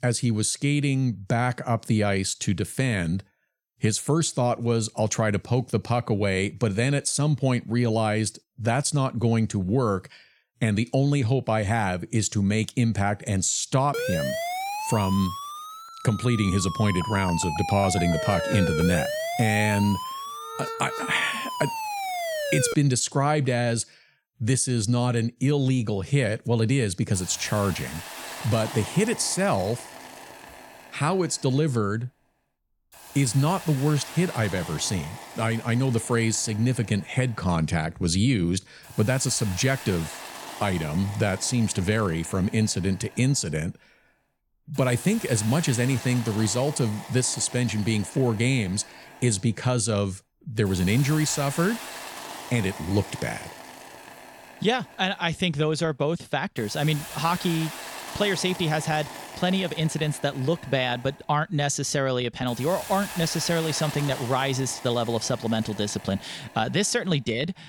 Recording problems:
hiss; noticeable; from 27 s on; 15 dB below the speech
siren; noticeable; from 14 to 23 s; peak 2 dB below the speech

